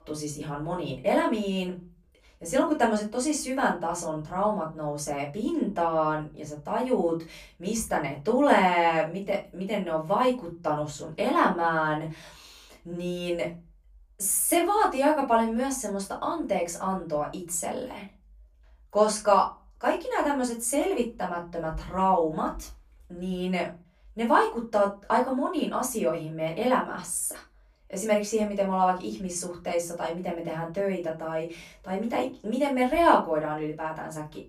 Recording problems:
off-mic speech; far
room echo; very slight; dies away in 0.3 s

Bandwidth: 15 kHz